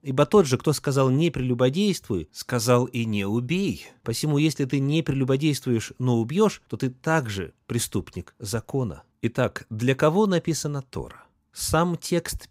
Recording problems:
none

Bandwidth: 15.5 kHz